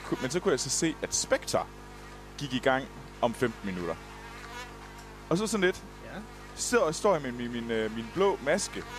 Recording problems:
electrical hum; noticeable; throughout; 50 Hz, 15 dB below the speech

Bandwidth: 14.5 kHz